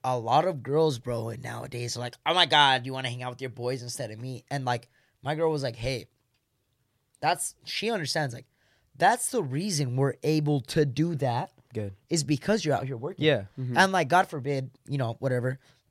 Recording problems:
none

